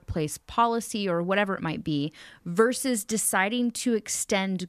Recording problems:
none

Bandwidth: 14.5 kHz